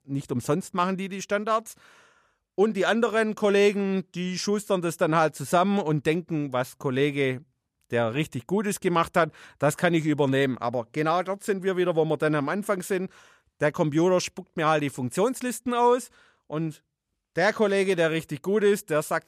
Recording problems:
none

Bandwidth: 14.5 kHz